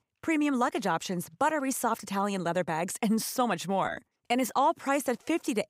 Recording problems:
none

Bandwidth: 15.5 kHz